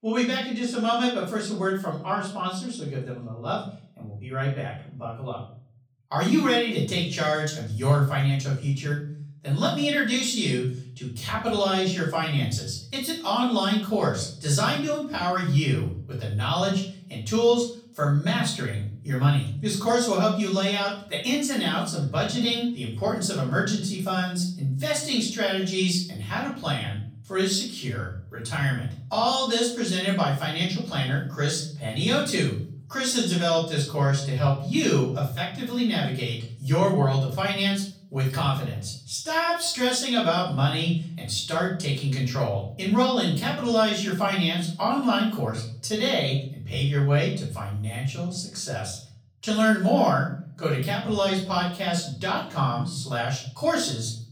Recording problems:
off-mic speech; far
room echo; noticeable; dies away in 0.5 s

